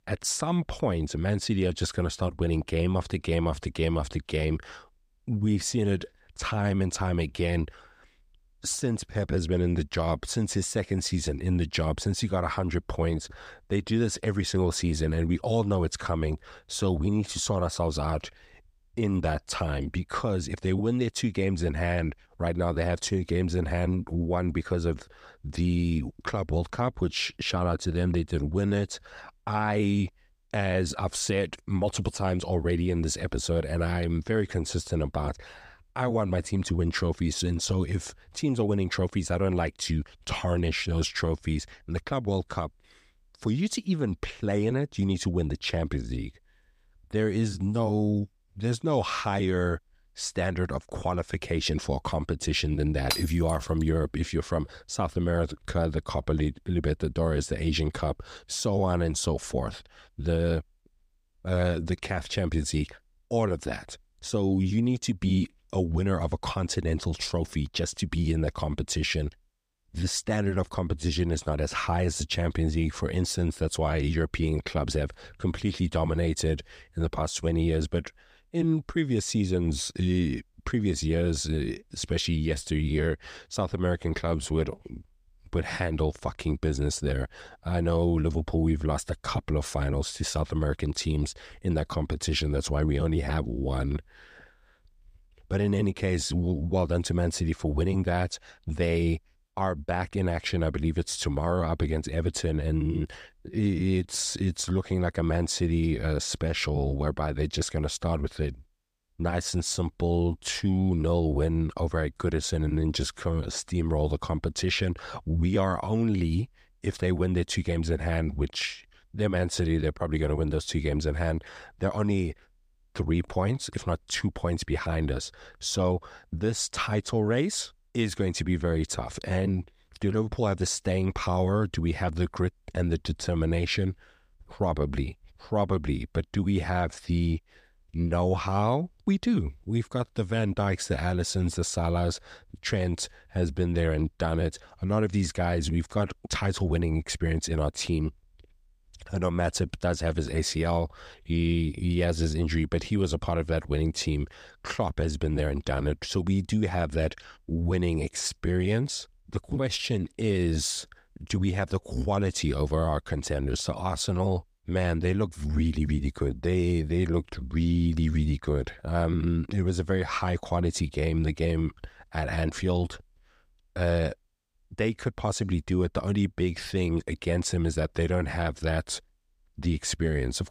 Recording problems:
none

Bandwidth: 15 kHz